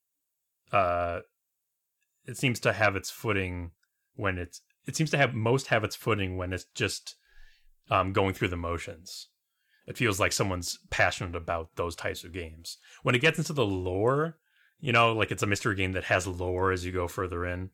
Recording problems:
none

